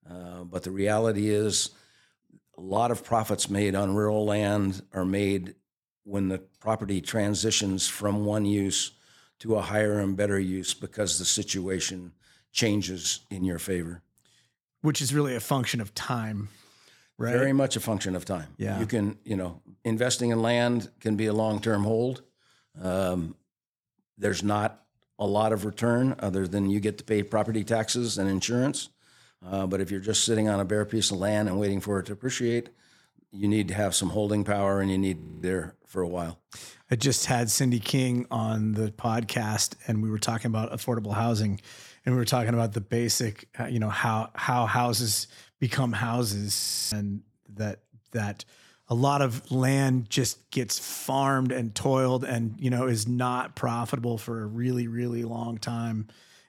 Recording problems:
audio freezing; at 35 s and at 47 s

